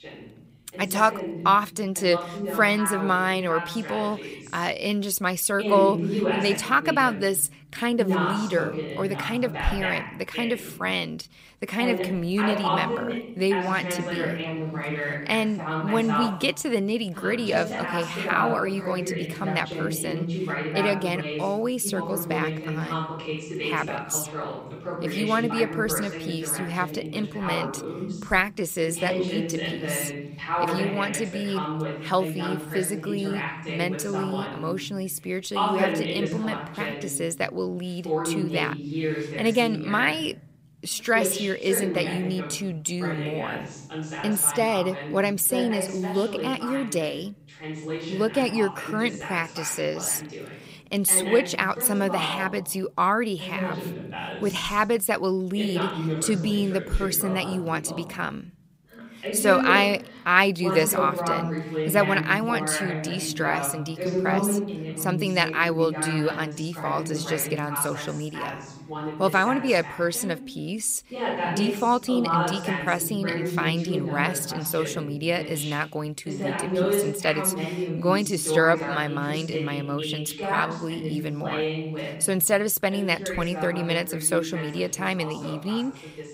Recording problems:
voice in the background; loud; throughout; 5 dB below the speech

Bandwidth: 15.5 kHz